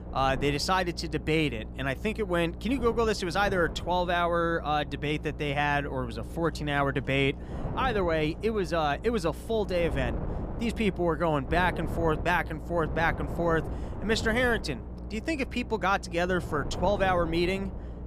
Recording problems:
wind noise on the microphone; occasional gusts; 15 dB below the speech
electrical hum; faint; throughout; 60 Hz, 25 dB below the speech

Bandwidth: 15 kHz